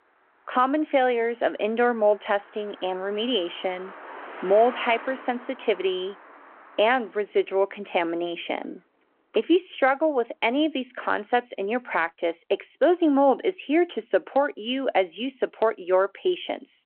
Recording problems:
phone-call audio
traffic noise; noticeable; throughout; 20 dB below the speech

